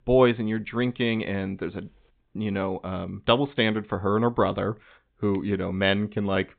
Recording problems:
high frequencies cut off; severe; nothing above 4 kHz

